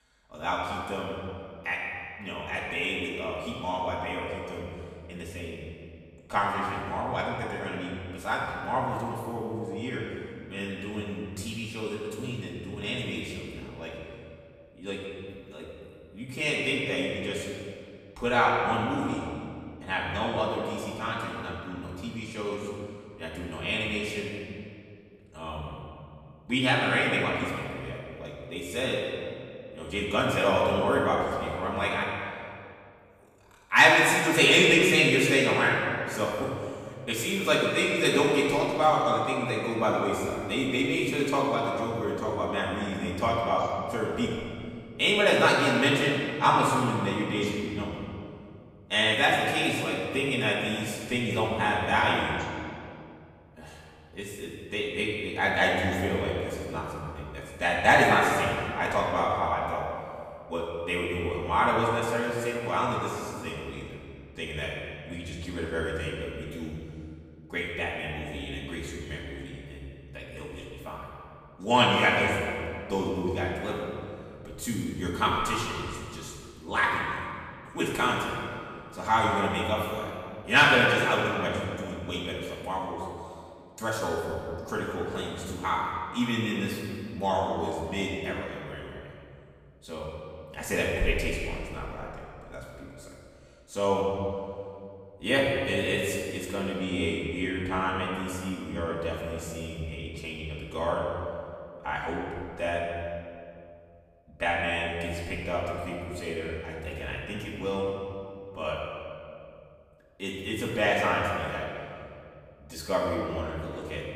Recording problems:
off-mic speech; far
room echo; noticeable; dies away in 2 s

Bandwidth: 15 kHz